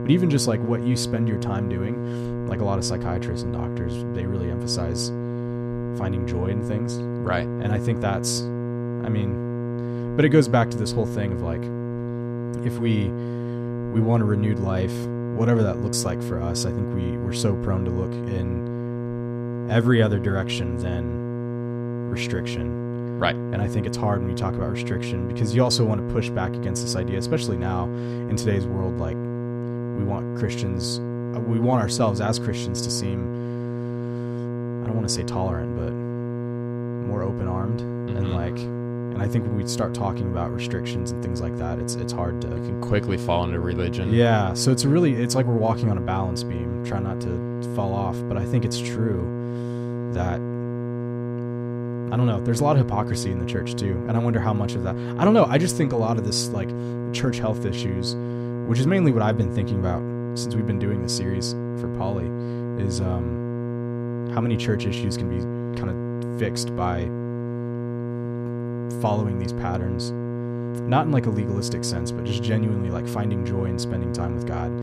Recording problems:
electrical hum; loud; throughout; 60 Hz, 5 dB below the speech

